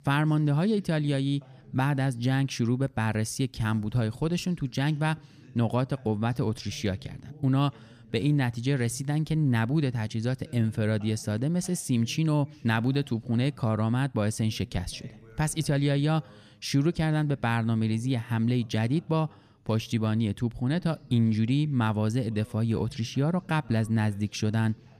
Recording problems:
voice in the background; faint; throughout; 25 dB below the speech

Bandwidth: 14.5 kHz